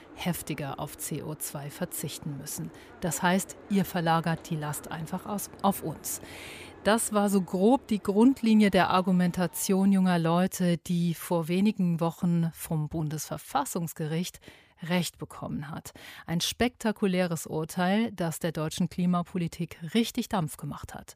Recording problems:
train or aircraft noise; faint; until 10 s; 20 dB below the speech

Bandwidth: 15 kHz